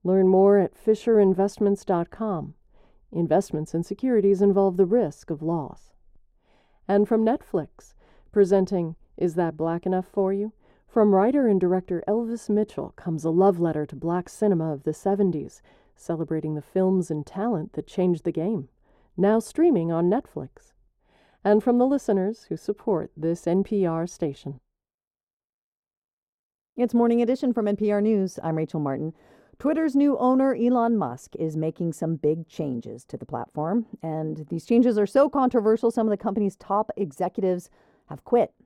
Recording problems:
muffled; very; fading above 1 kHz

